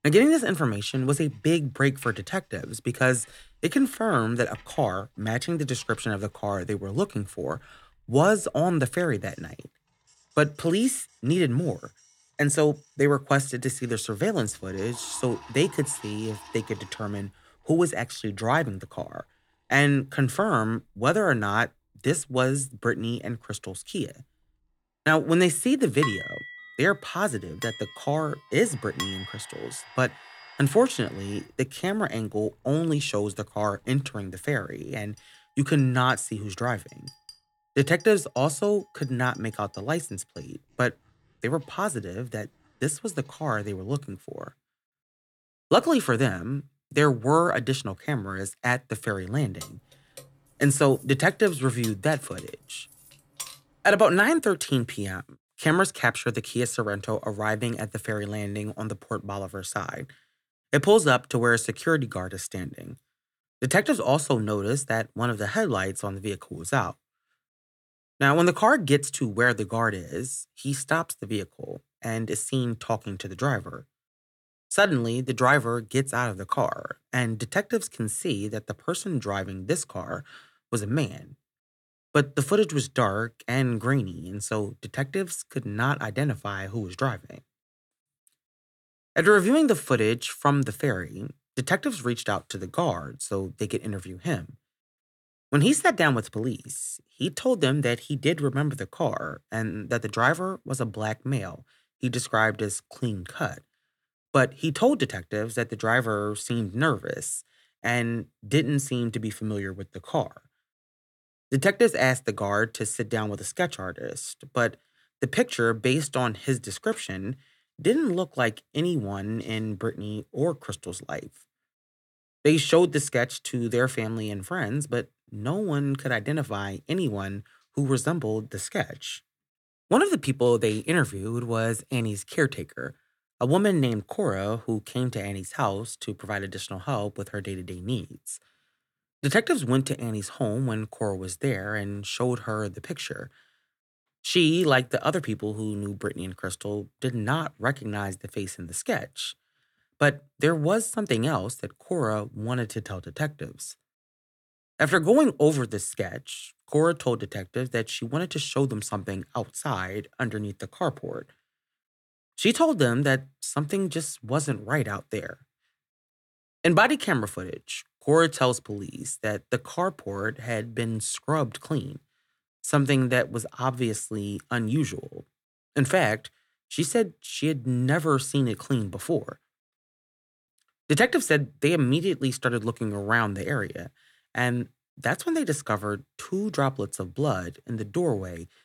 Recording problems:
household noises; faint; until 44 s; 25 dB below the speech
clattering dishes; noticeable; from 26 to 29 s; peak 3 dB below the speech
jangling keys; faint; from 50 to 54 s; peak 10 dB below the speech

